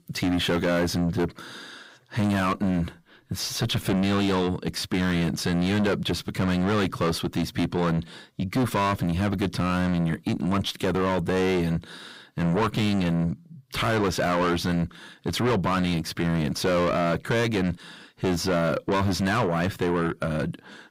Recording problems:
distortion; heavy; 6 dB below the speech

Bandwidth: 15.5 kHz